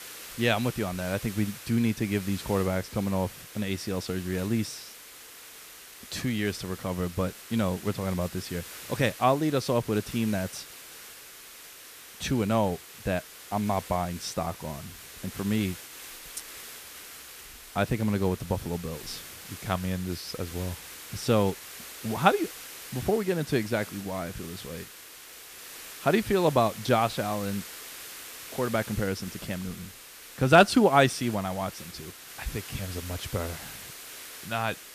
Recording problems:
hiss; noticeable; throughout; 15 dB below the speech

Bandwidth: 14.5 kHz